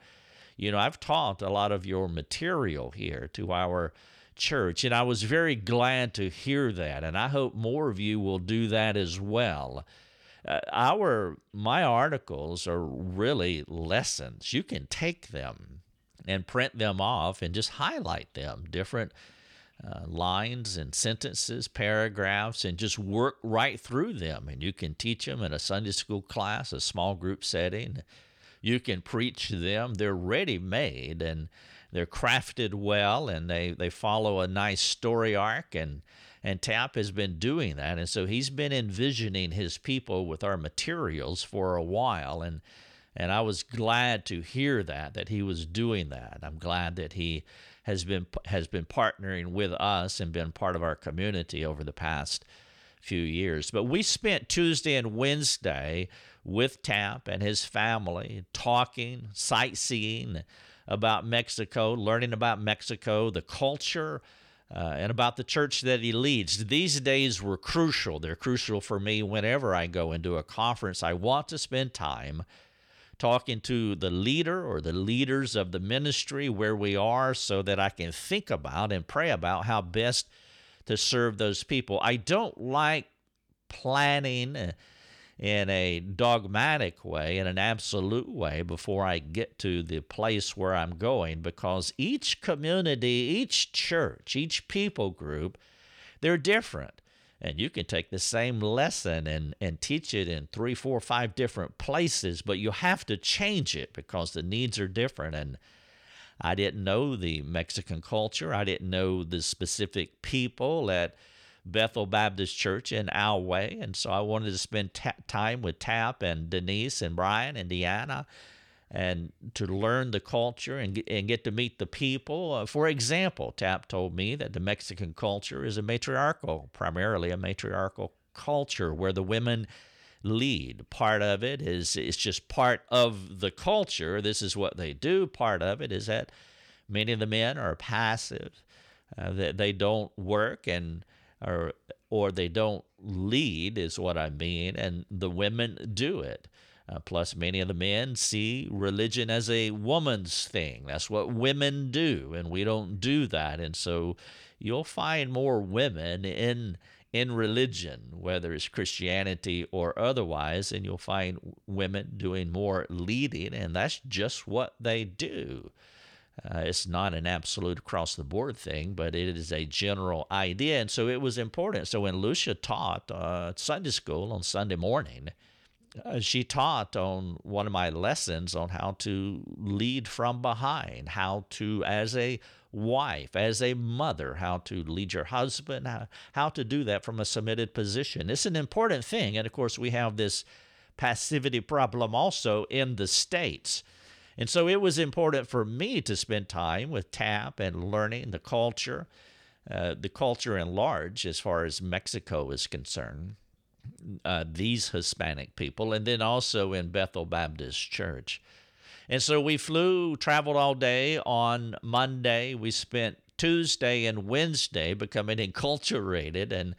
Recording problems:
none

